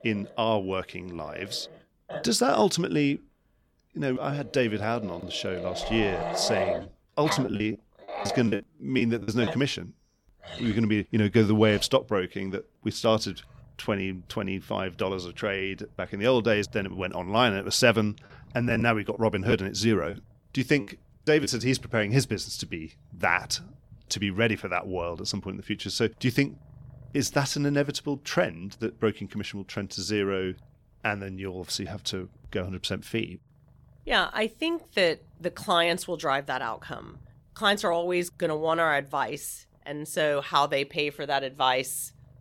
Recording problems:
animal sounds; noticeable; throughout; 10 dB below the speech
choppy; very; from 7 to 9.5 s and from 18 to 21 s; 14% of the speech affected

